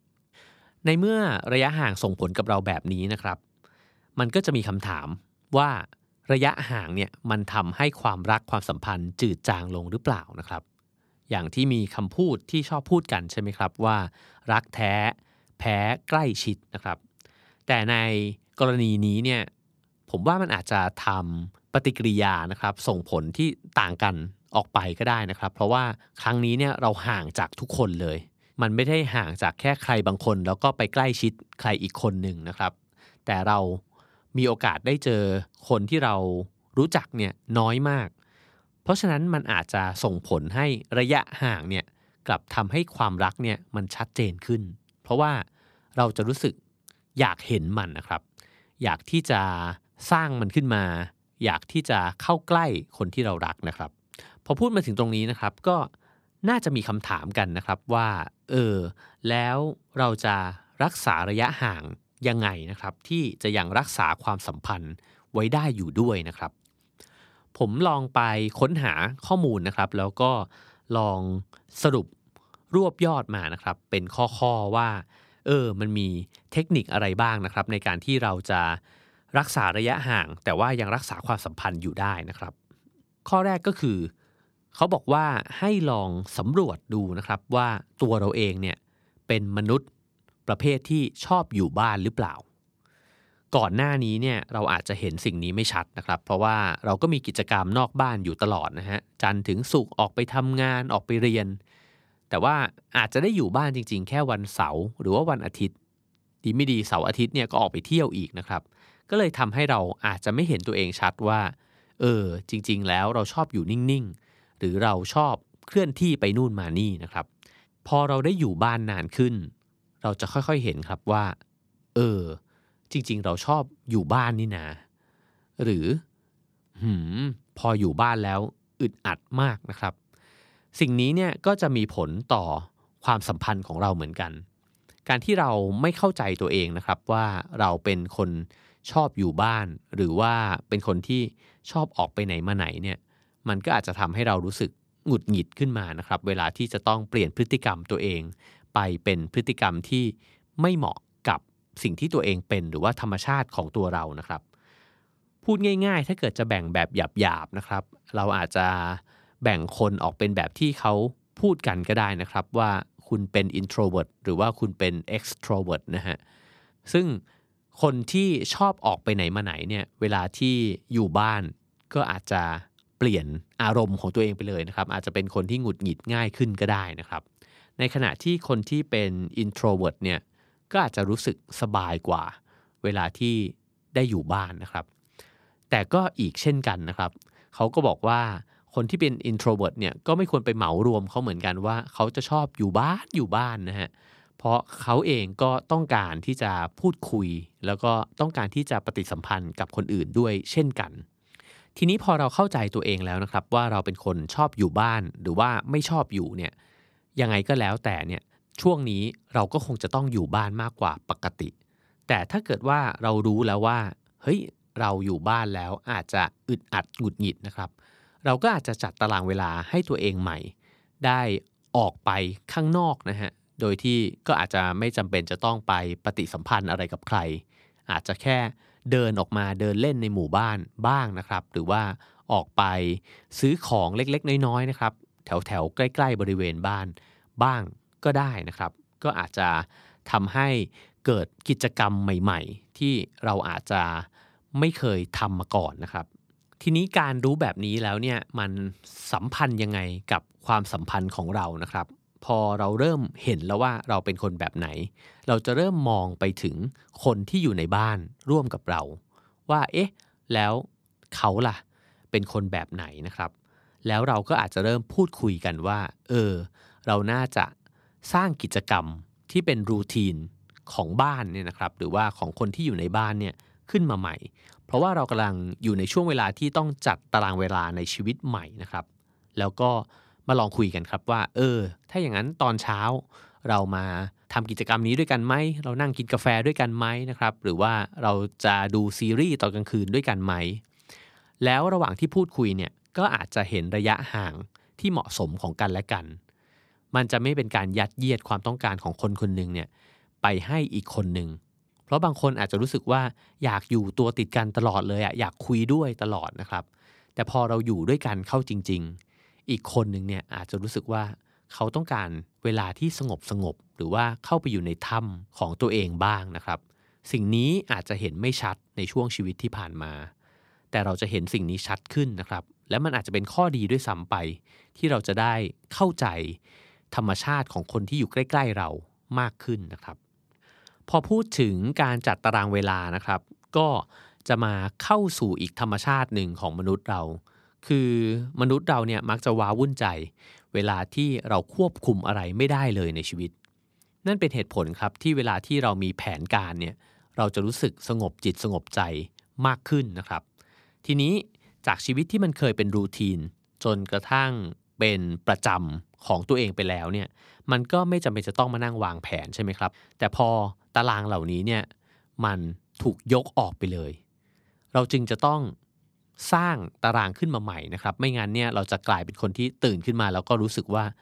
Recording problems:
none

